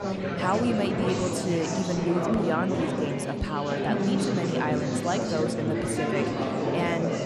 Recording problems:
chatter from many people; very loud; throughout; 2 dB above the speech

